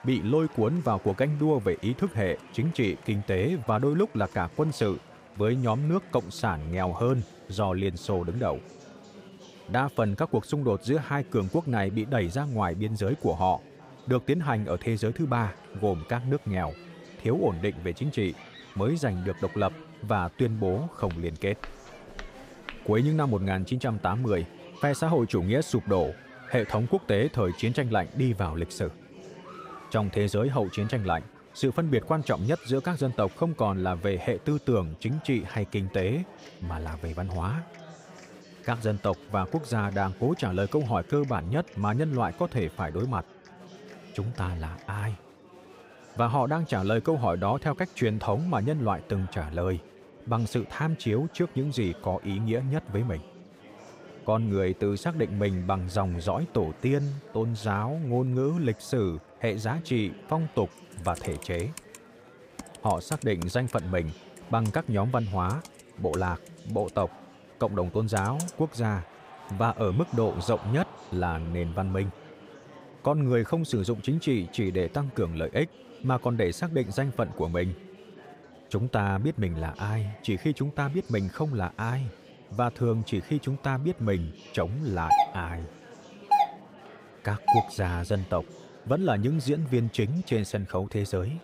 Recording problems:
murmuring crowd; noticeable; throughout; 20 dB below the speech
footsteps; faint; from 21 to 23 s; peak 15 dB below the speech
keyboard typing; noticeable; from 1:01 to 1:10; peak 9 dB below the speech
doorbell; loud; from 1:25 to 1:28; peak 5 dB above the speech

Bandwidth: 15.5 kHz